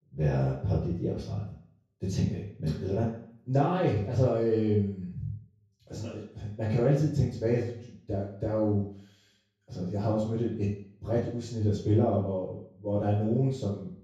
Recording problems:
off-mic speech; far
room echo; noticeable; dies away in 0.6 s

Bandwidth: 13.5 kHz